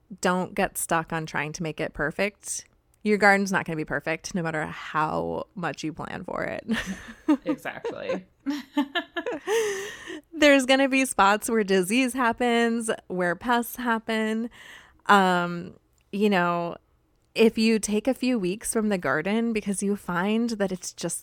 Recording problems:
none

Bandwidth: 17 kHz